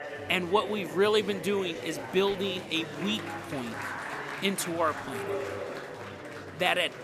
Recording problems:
chatter from many people; loud; throughout; 9 dB below the speech

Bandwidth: 14.5 kHz